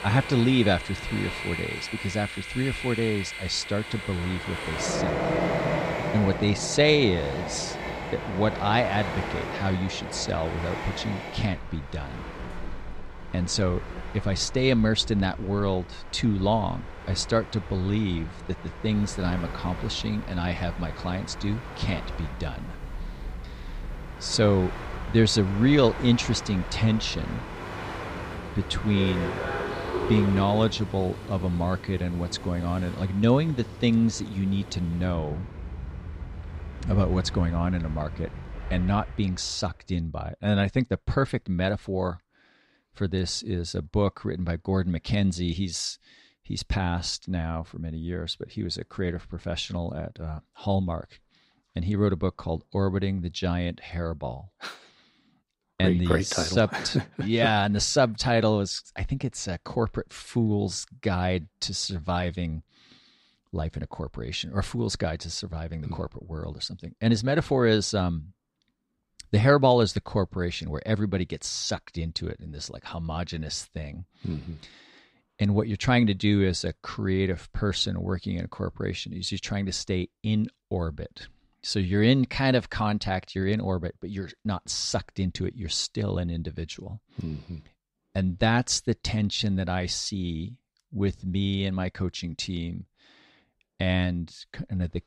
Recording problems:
train or aircraft noise; loud; until 39 s; 8 dB below the speech

